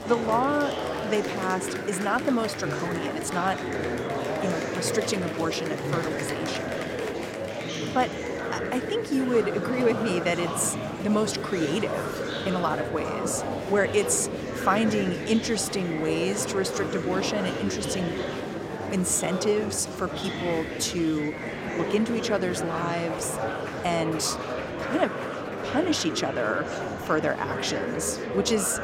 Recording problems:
murmuring crowd; loud; throughout; 3 dB below the speech

